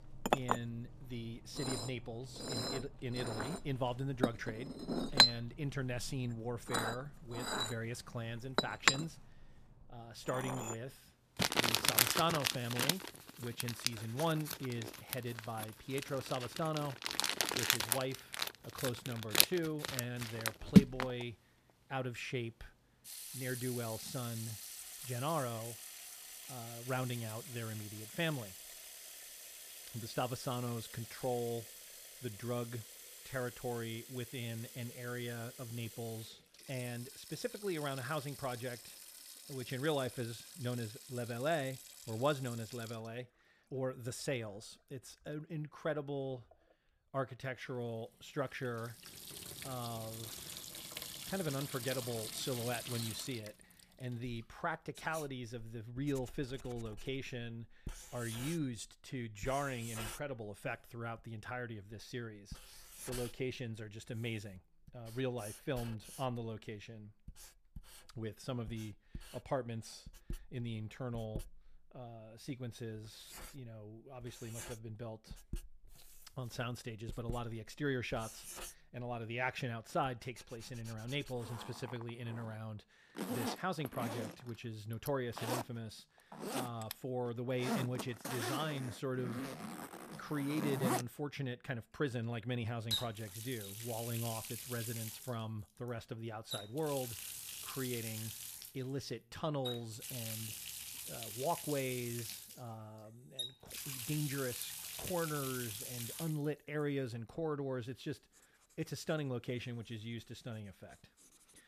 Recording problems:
household noises; very loud; throughout; 2 dB above the speech

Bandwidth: 14.5 kHz